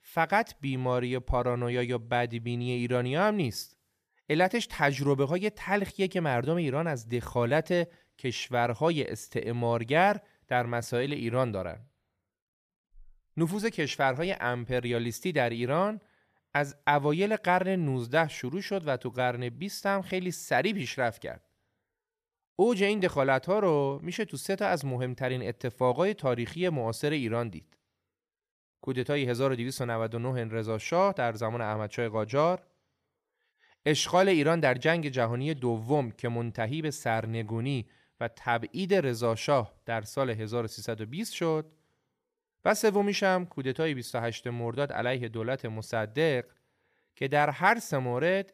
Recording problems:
none

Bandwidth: 14.5 kHz